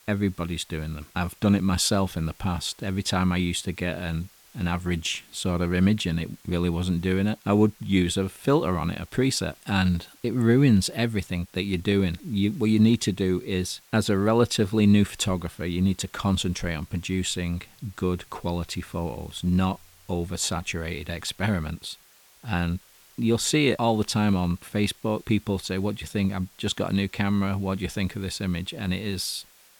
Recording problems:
hiss; faint; throughout; 25 dB below the speech

